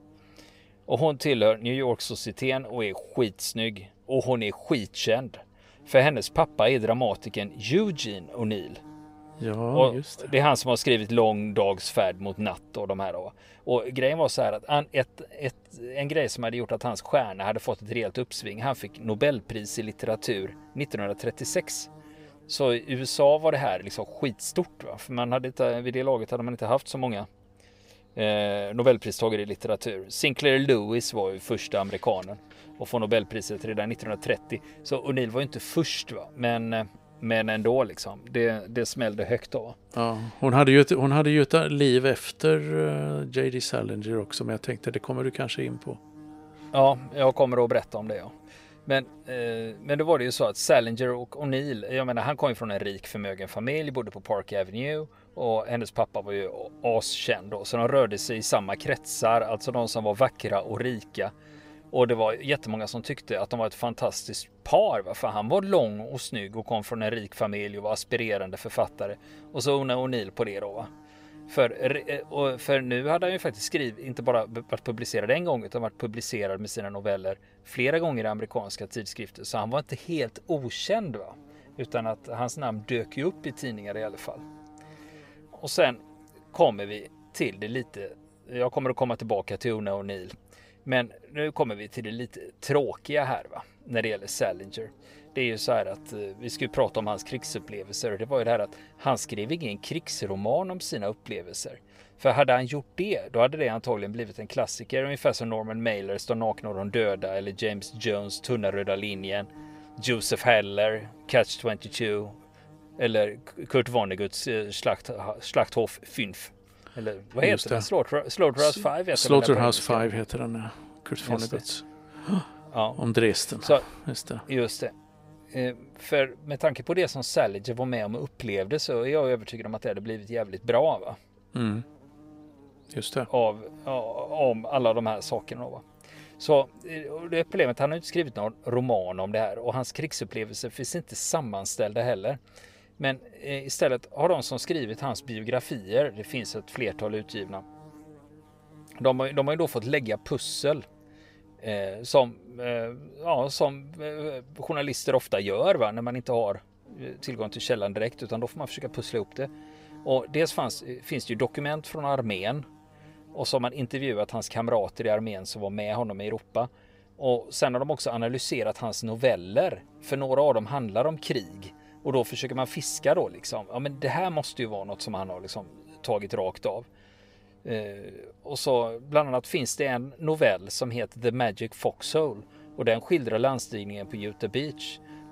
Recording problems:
electrical hum; faint; throughout; 50 Hz, 30 dB below the speech

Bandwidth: 15.5 kHz